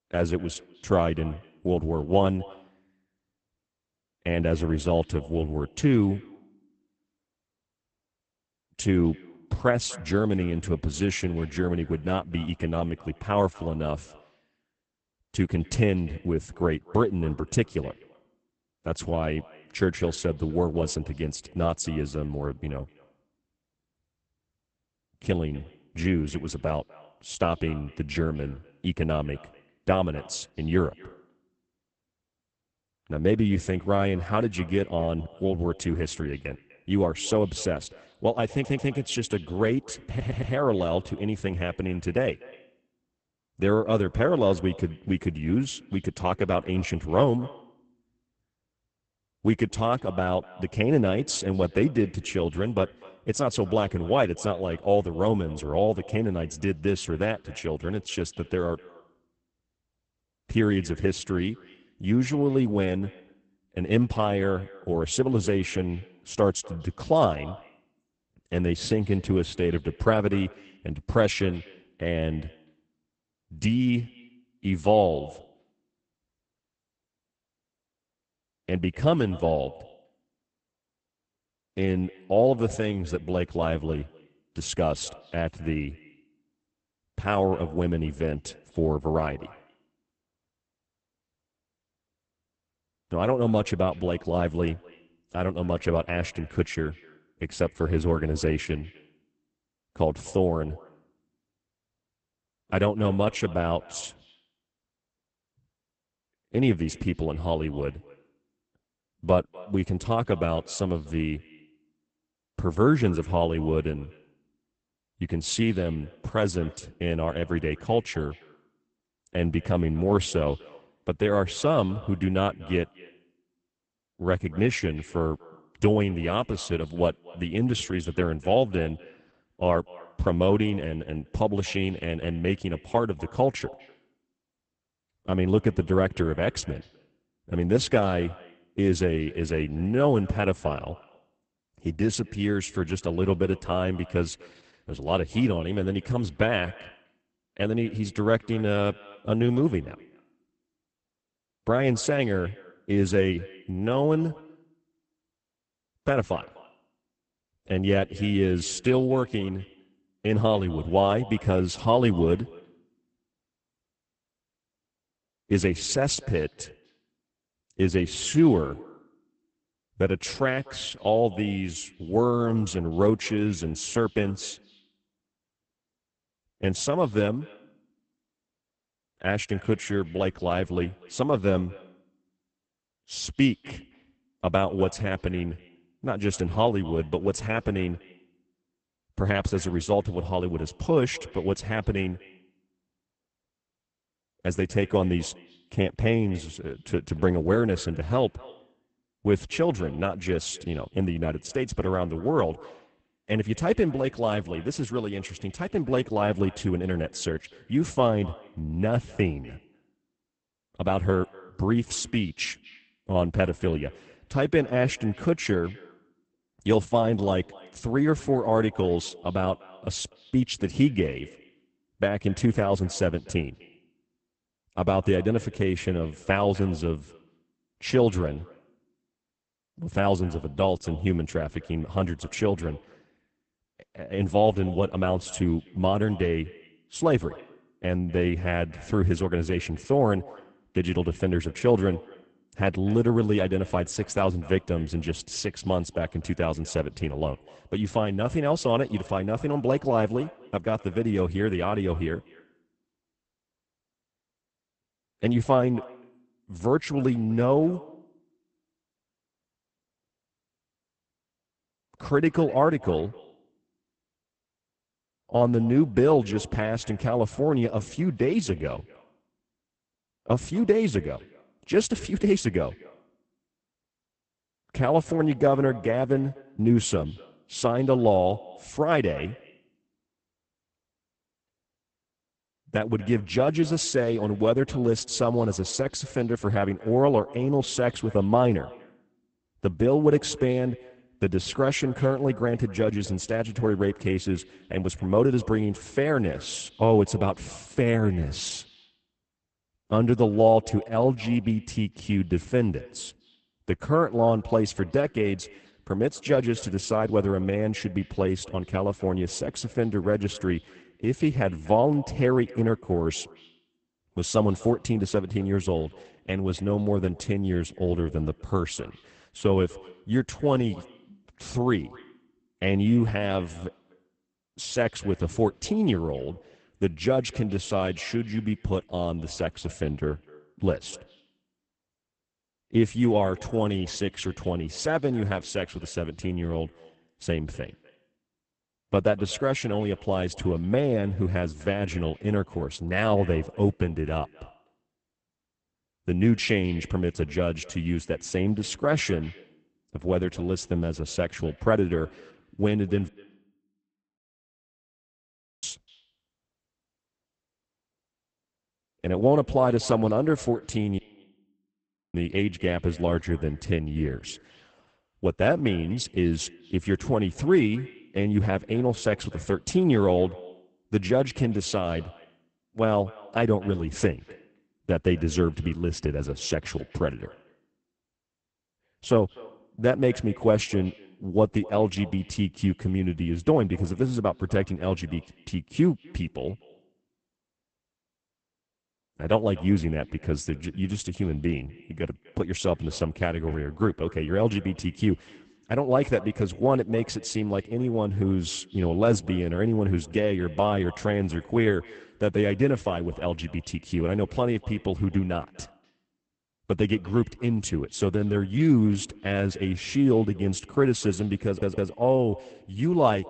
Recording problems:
garbled, watery; badly; nothing above 8 kHz
echo of what is said; faint; throughout; 250 ms later, 25 dB below the speech
audio stuttering; at 39 s, at 40 s and at 6:51
audio cutting out; at 5:53 for 2.5 s and at 6:01 for 1 s

